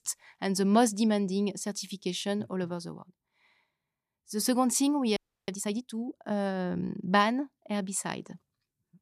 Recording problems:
audio freezing; at 5 s

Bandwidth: 14.5 kHz